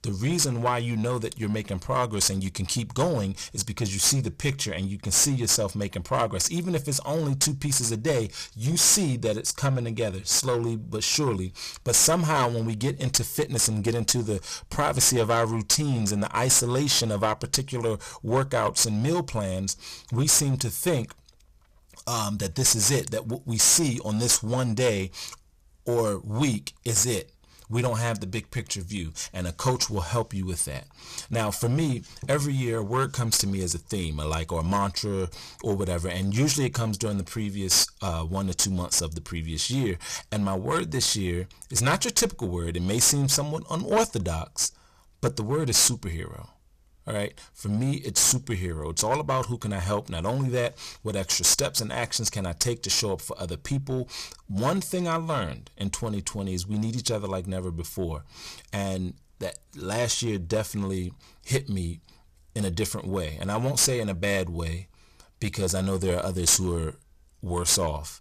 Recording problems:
distortion; heavy; 6% of the sound clipped

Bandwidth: 14.5 kHz